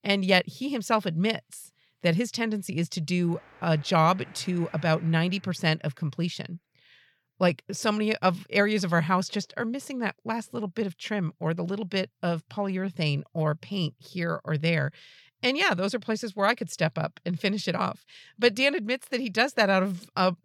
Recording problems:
traffic noise; faint; until 5 s; 25 dB below the speech

